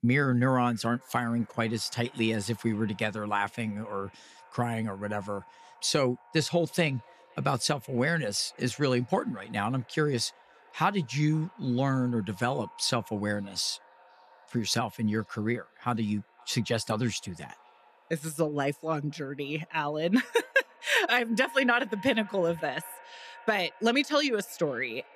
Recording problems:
echo of what is said; faint; throughout; 510 ms later, 25 dB below the speech

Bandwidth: 14.5 kHz